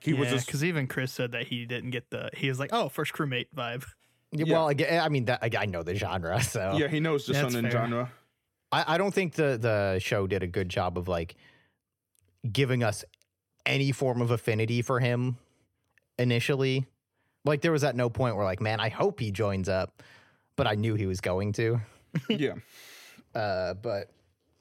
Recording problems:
none

